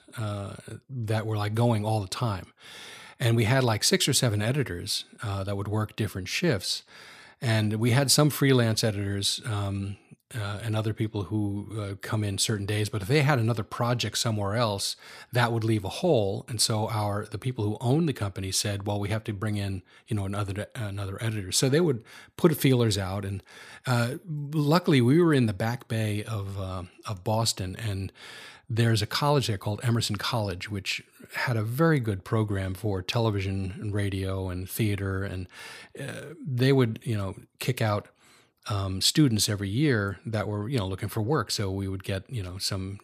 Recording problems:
none

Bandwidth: 14.5 kHz